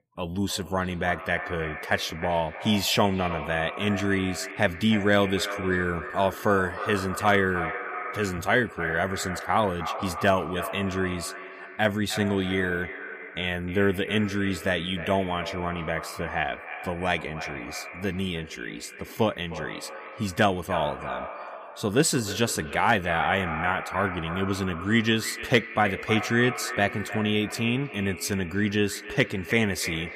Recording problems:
echo of what is said; strong; throughout; 310 ms later, 9 dB below the speech

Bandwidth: 15 kHz